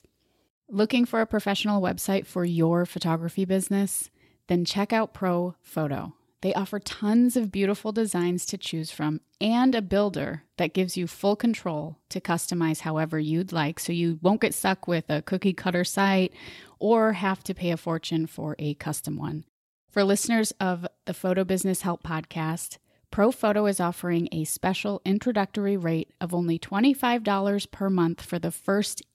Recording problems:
none

